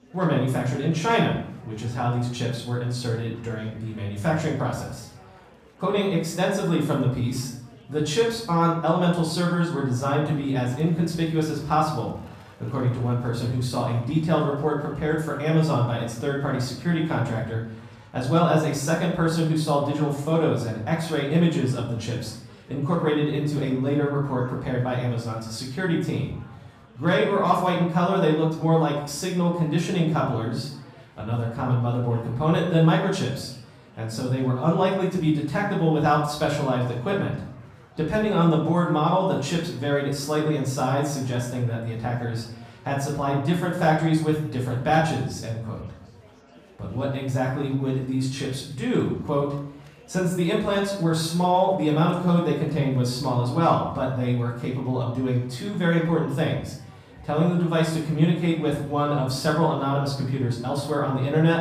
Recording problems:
off-mic speech; far
room echo; noticeable; dies away in 0.6 s
chatter from many people; faint; throughout; 25 dB below the speech

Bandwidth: 14.5 kHz